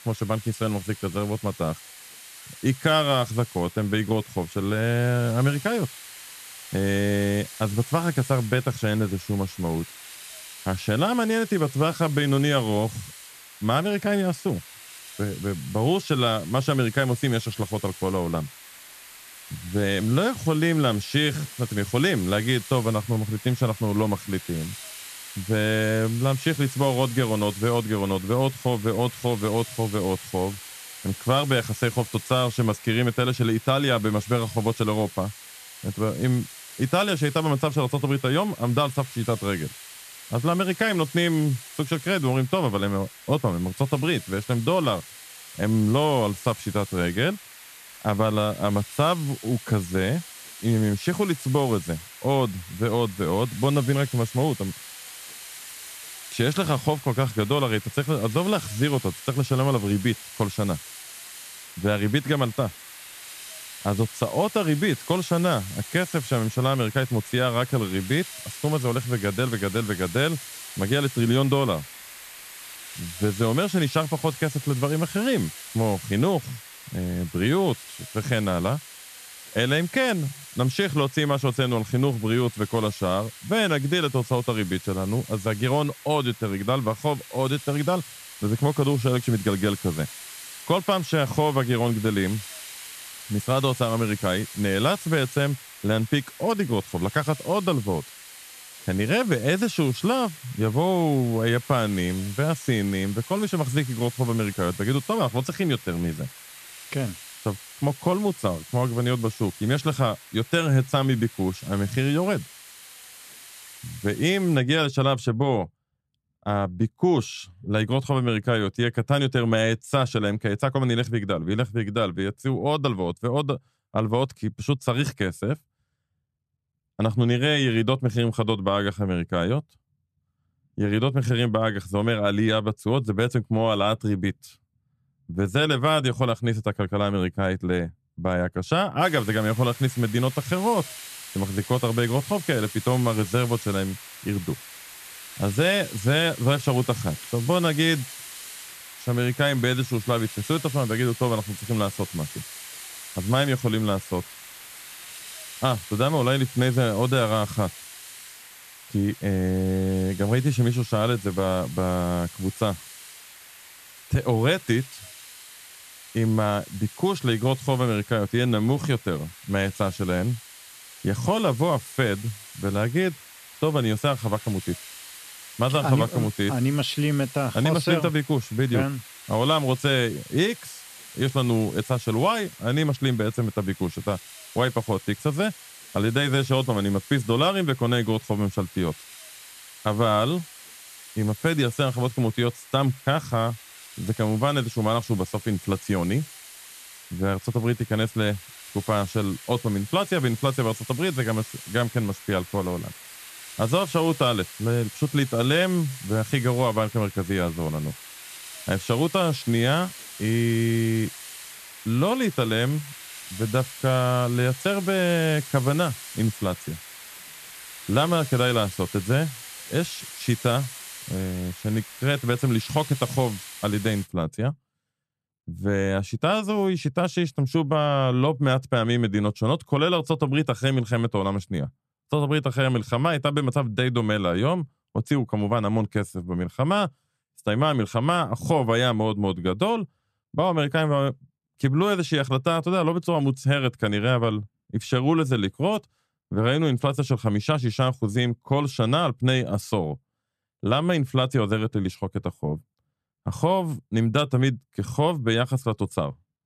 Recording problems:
hiss; noticeable; until 1:55 and from 2:19 to 3:44; 15 dB below the speech

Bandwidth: 14 kHz